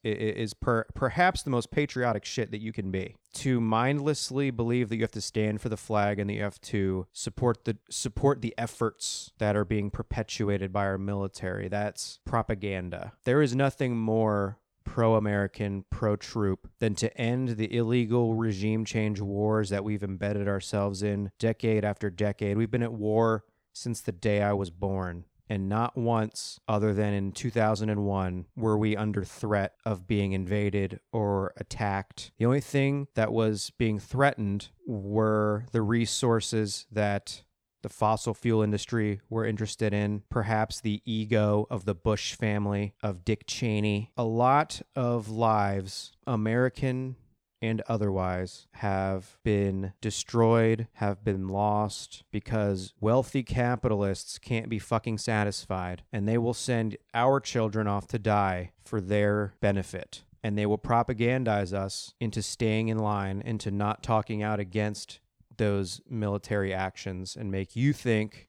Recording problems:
uneven, jittery; strongly; from 1.5 to 55 s

